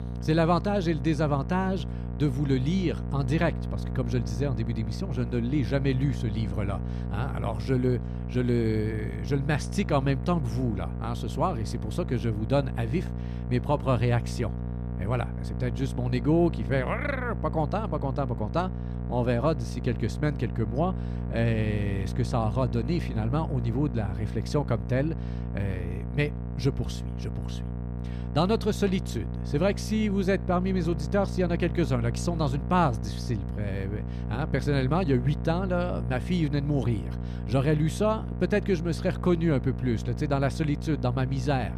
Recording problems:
electrical hum; noticeable; throughout; 60 Hz, 10 dB below the speech

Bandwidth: 14.5 kHz